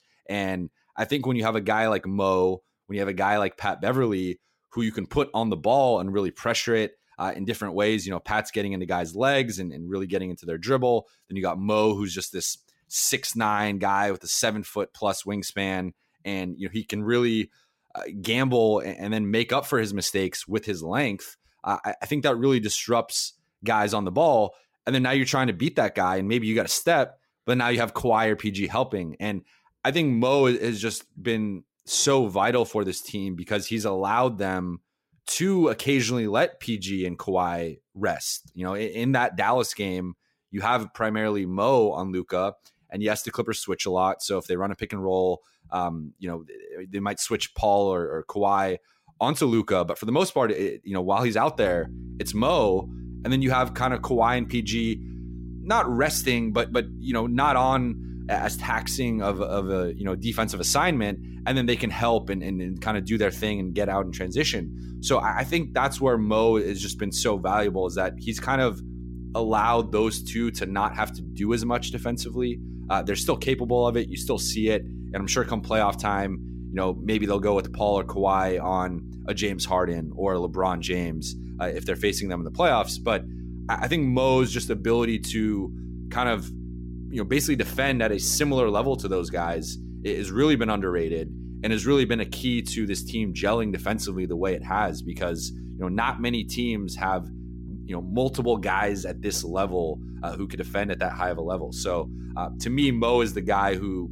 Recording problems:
electrical hum; faint; from 52 s on; 60 Hz, 20 dB below the speech

